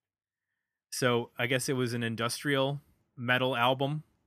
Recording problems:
none

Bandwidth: 15 kHz